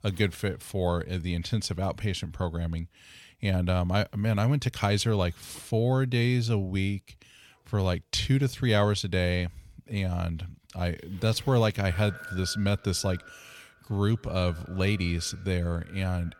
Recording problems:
echo of what is said; faint; from 12 s on; 120 ms later, 20 dB below the speech

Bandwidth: 18 kHz